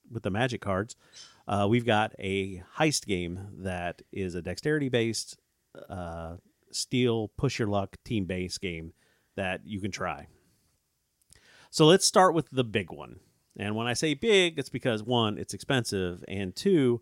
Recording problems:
none

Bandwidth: 16 kHz